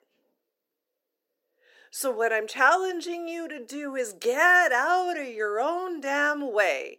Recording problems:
thin; somewhat; fading below 350 Hz

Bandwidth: 16 kHz